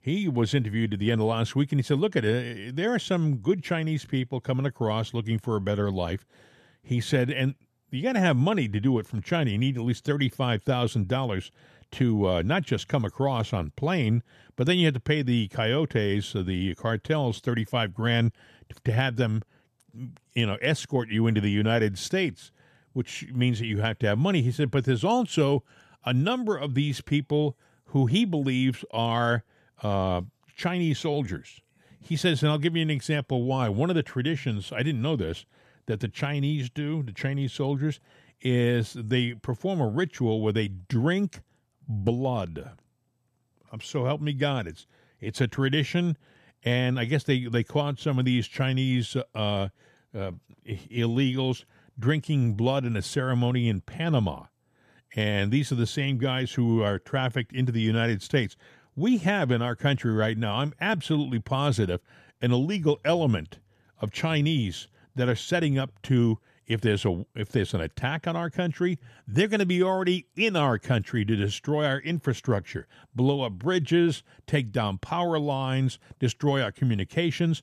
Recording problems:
none

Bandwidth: 14.5 kHz